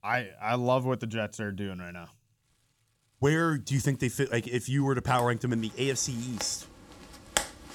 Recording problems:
household noises; loud; throughout; 9 dB below the speech

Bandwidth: 17.5 kHz